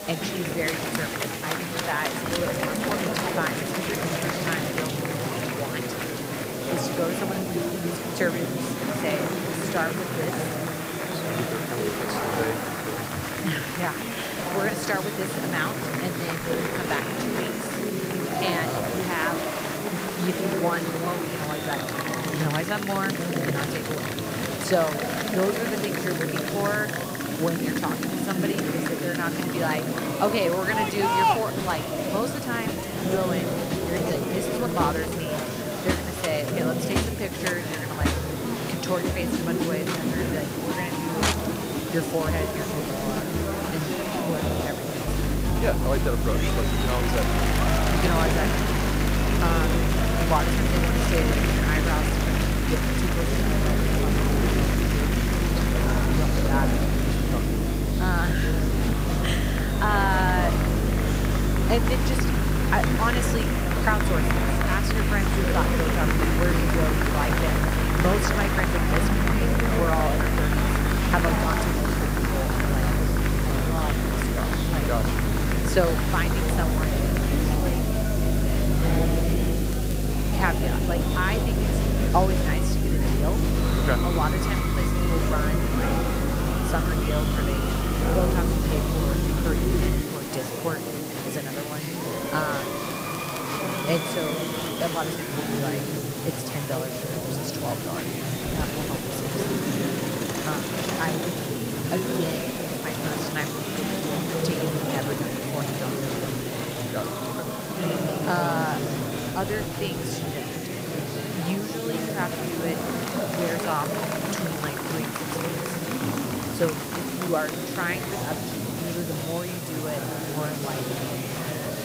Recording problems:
murmuring crowd; very loud; throughout; 3 dB above the speech
electrical hum; loud; from 45 s to 1:30; 50 Hz, 5 dB below the speech
hiss; loud; throughout; 7 dB below the speech
crackling; noticeable; from 4 to 5.5 s, at 1:20 and from 1:33 to 1:35; 15 dB below the speech

